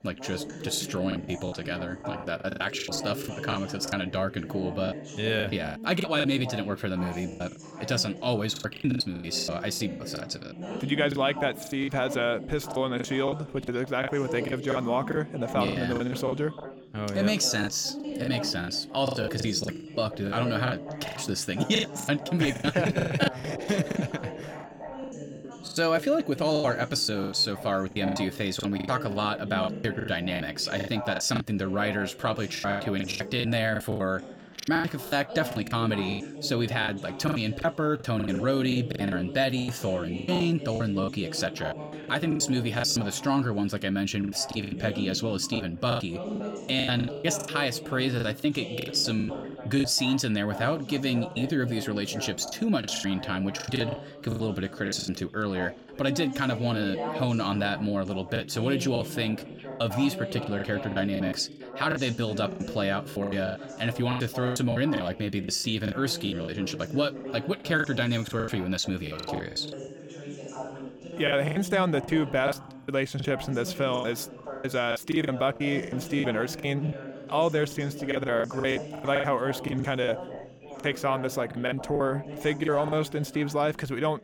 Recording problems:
background chatter; noticeable; throughout; 3 voices, 10 dB below the speech
choppy; very; 14% of the speech affected

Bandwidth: 17 kHz